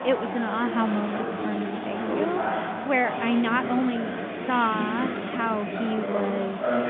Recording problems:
phone-call audio
chatter from many people; loud; throughout; 3 dB below the speech
uneven, jittery; strongly; from 1.5 to 6.5 s

